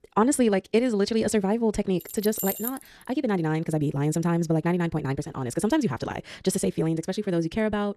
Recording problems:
wrong speed, natural pitch; too fast; 1.7 times normal speed
jangling keys; noticeable; at 2 s; peak 4 dB below the speech

